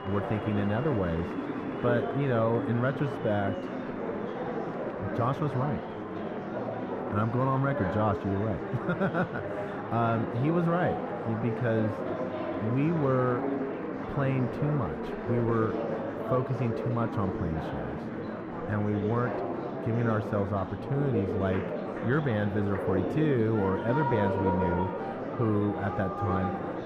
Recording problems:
muffled; very; fading above 3 kHz
murmuring crowd; loud; throughout; 4 dB below the speech

